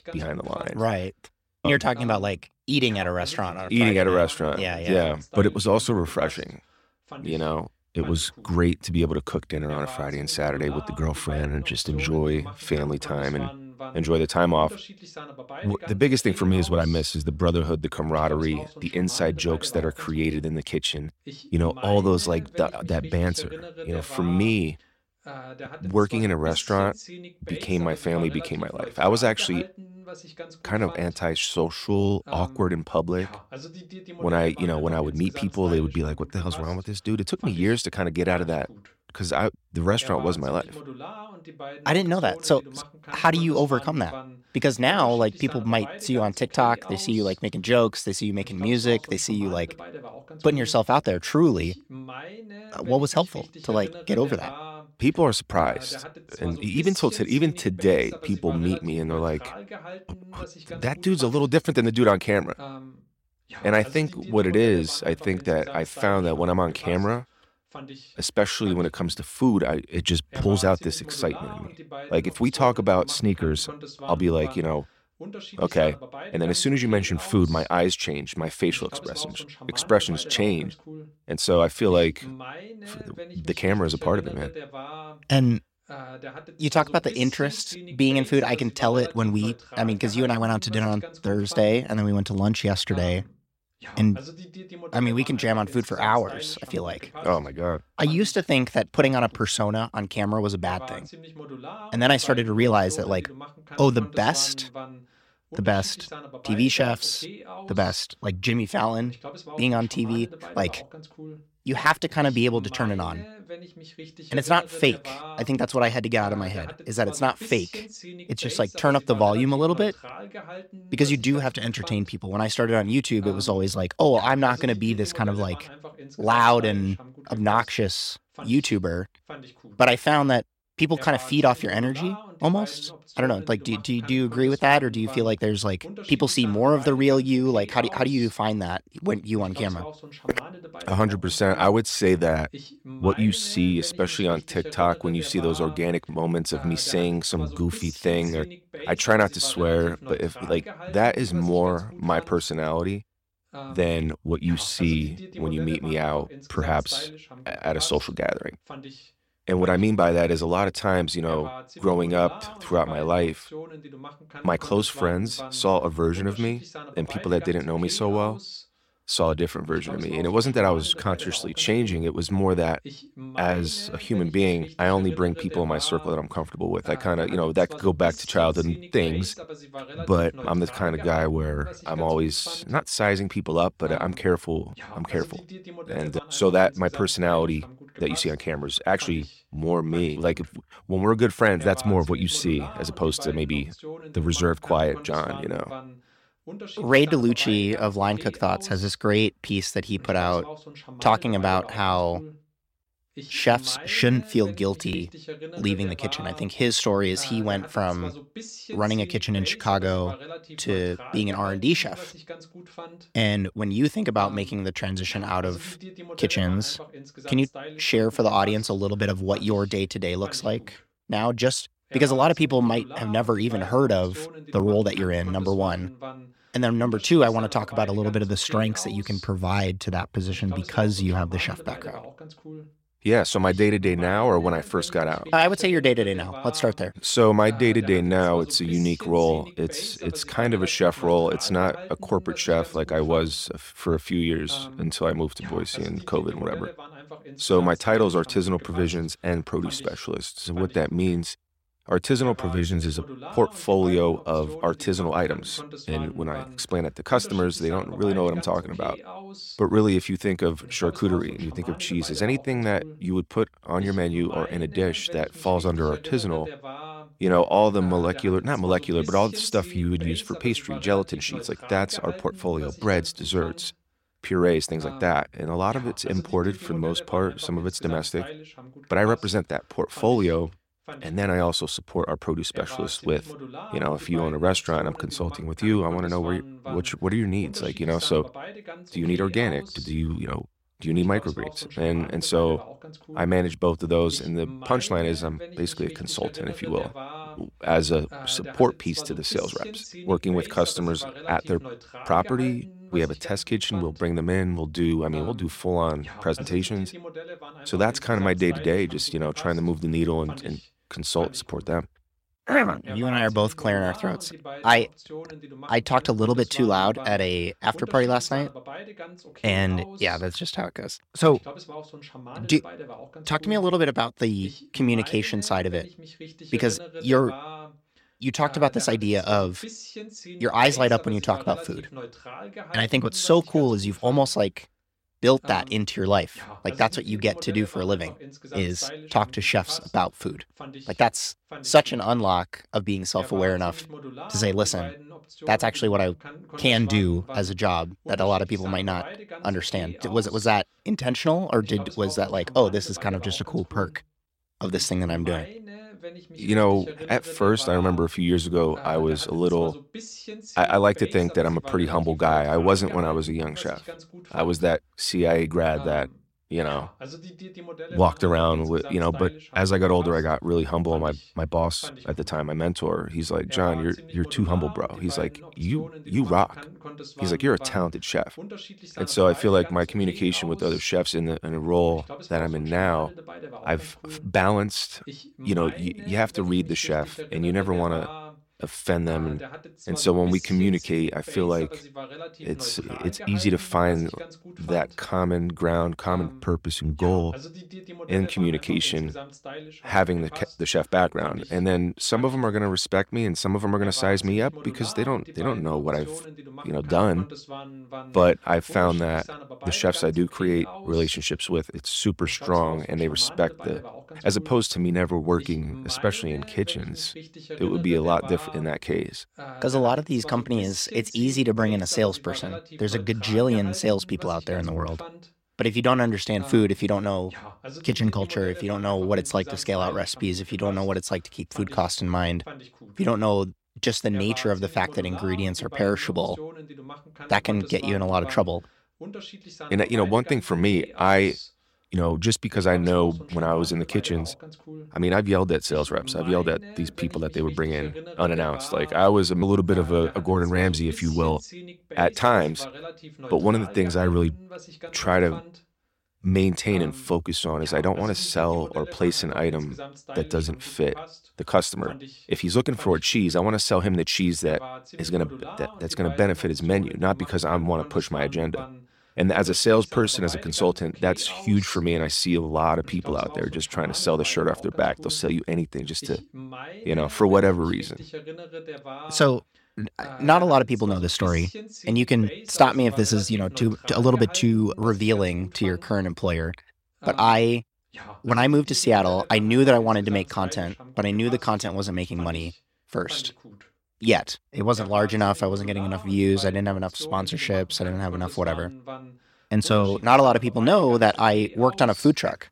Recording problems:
voice in the background; noticeable; throughout; 15 dB below the speech

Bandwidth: 16.5 kHz